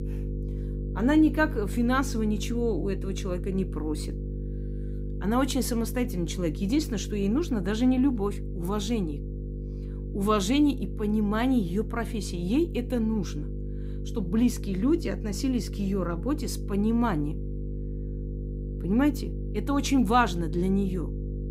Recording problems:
electrical hum; noticeable; throughout; 50 Hz, 15 dB below the speech

